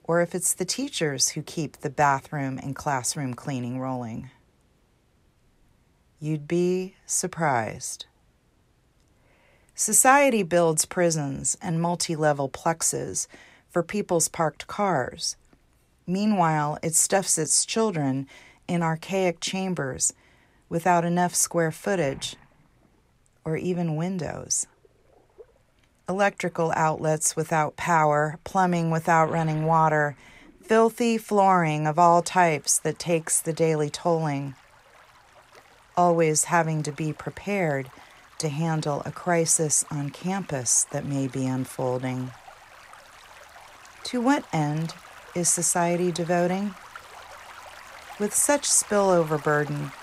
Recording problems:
rain or running water; faint; throughout; 25 dB below the speech

